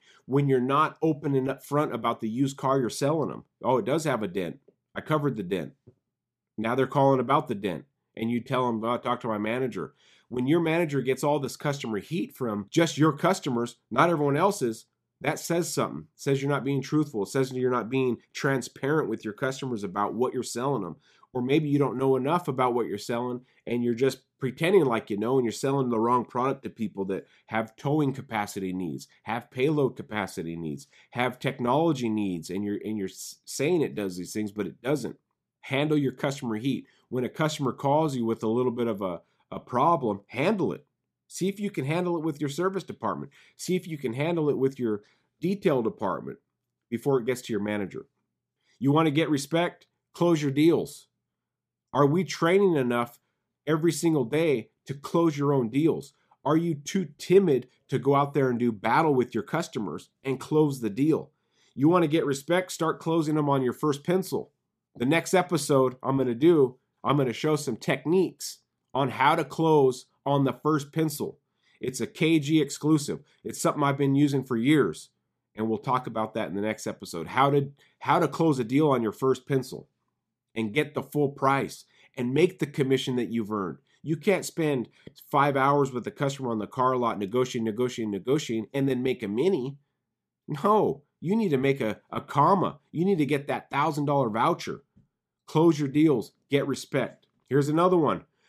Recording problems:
none

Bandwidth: 14.5 kHz